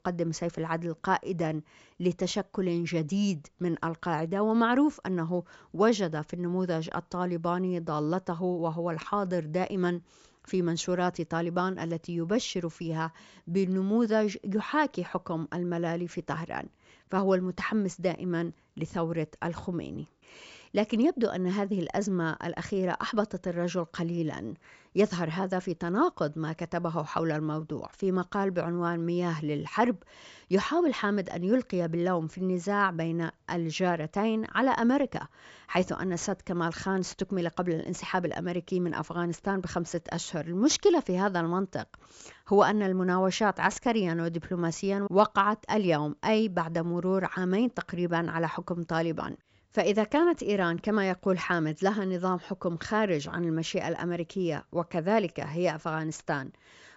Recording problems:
high frequencies cut off; noticeable; nothing above 8 kHz

